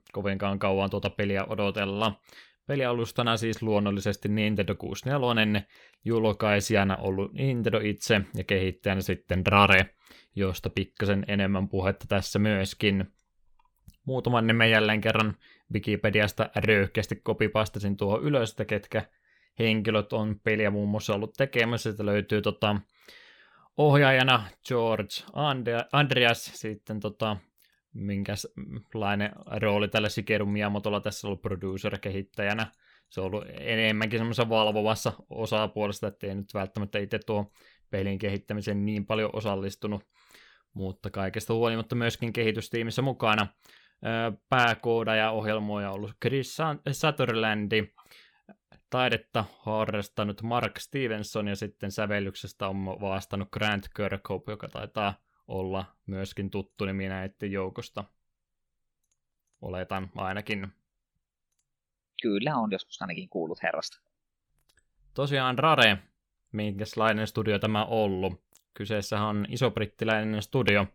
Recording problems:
none

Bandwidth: 18.5 kHz